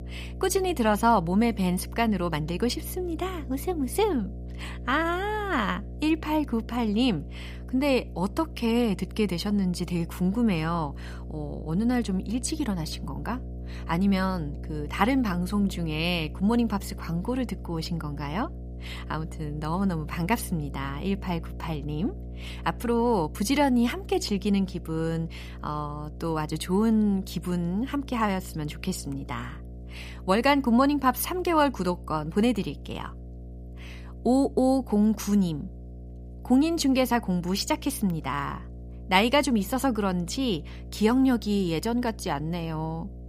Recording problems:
electrical hum; faint; throughout; 60 Hz, 20 dB below the speech

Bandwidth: 15 kHz